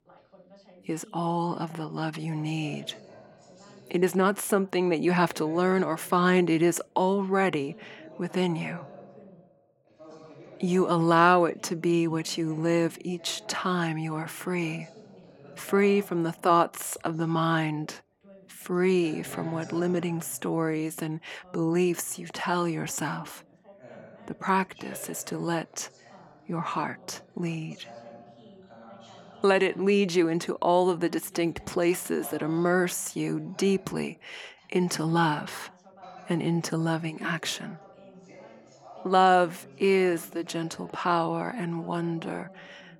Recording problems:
background chatter; faint; throughout; 2 voices, 25 dB below the speech

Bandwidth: 19 kHz